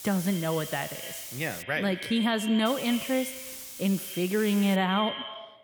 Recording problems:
echo of what is said; strong; throughout; 80 ms later, 10 dB below the speech
hiss; noticeable; until 1.5 s and from 2.5 to 5 s; 10 dB below the speech

